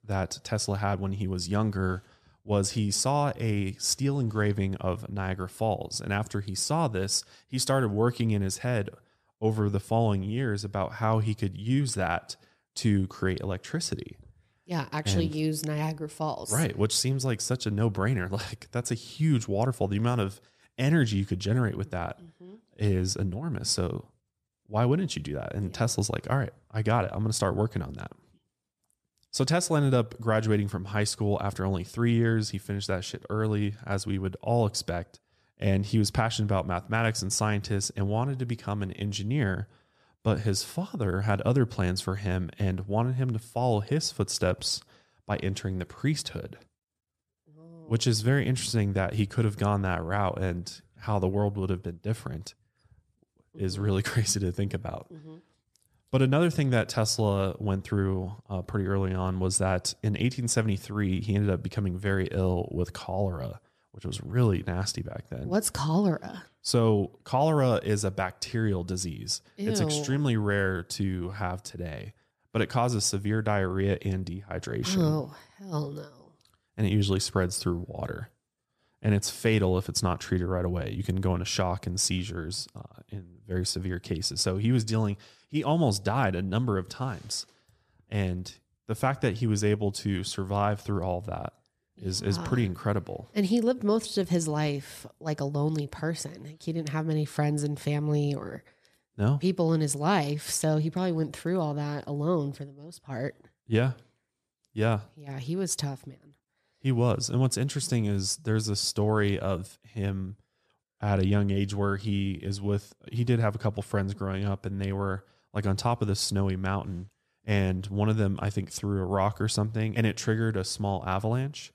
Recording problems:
none

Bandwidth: 14.5 kHz